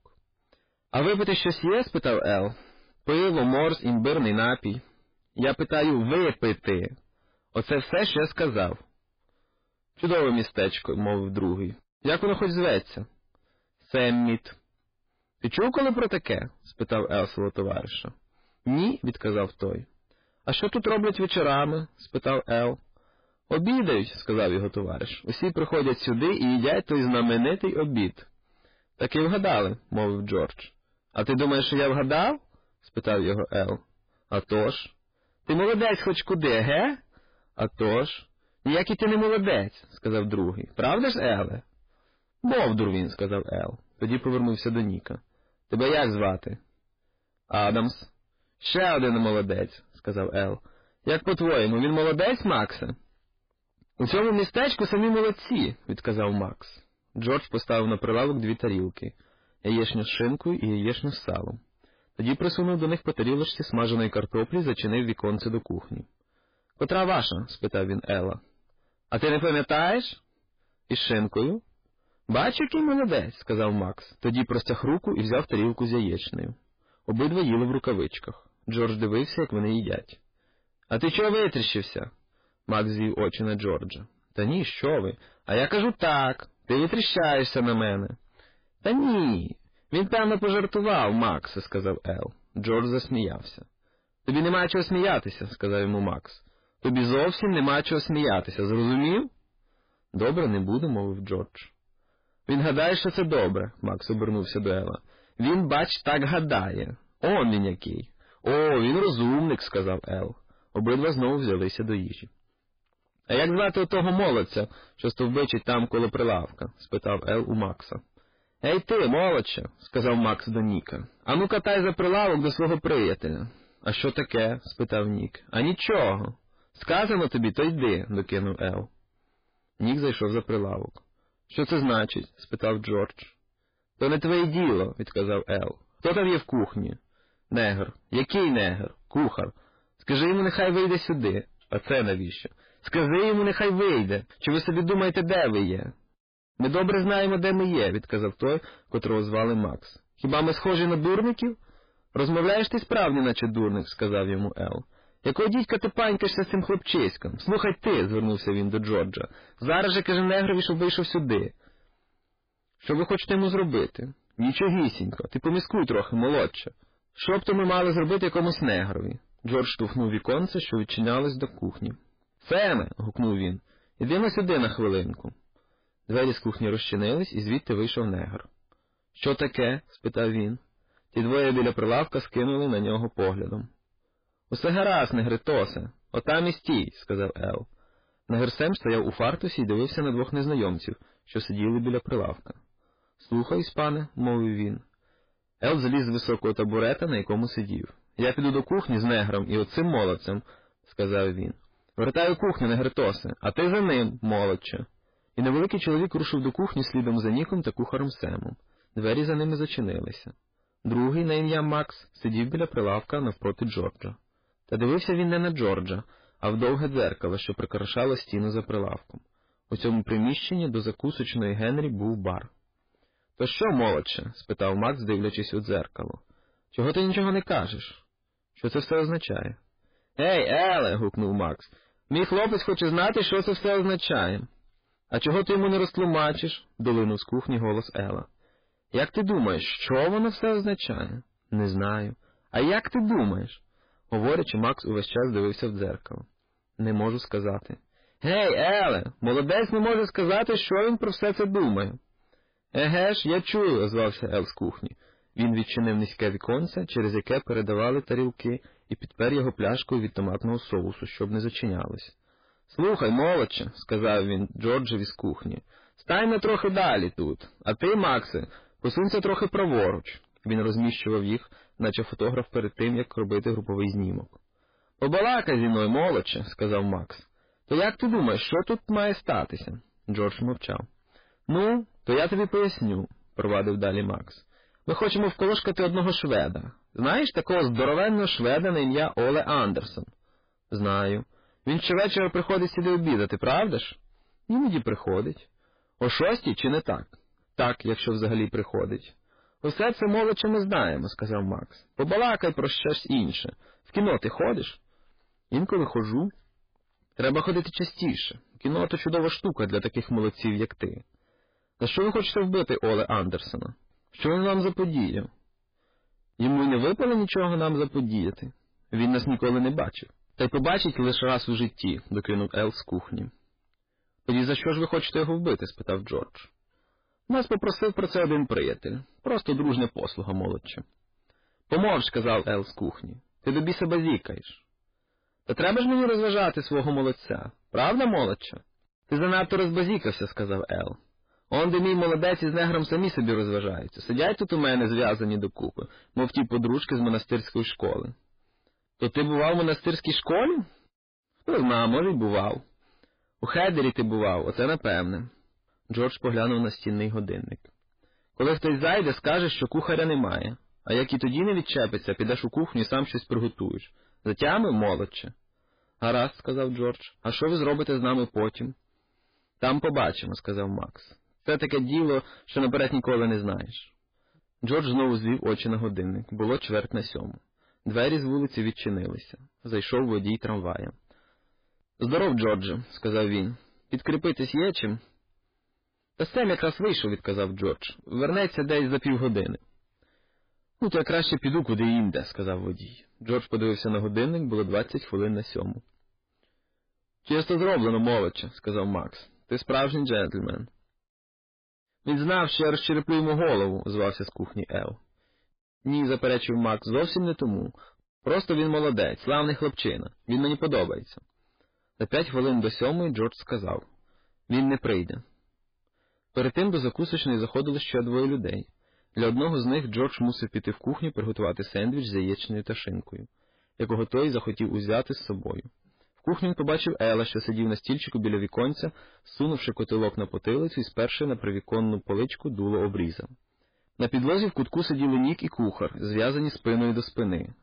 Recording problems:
distortion; heavy; 7 dB below the speech
garbled, watery; badly

